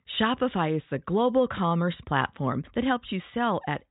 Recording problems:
high frequencies cut off; severe; nothing above 4 kHz

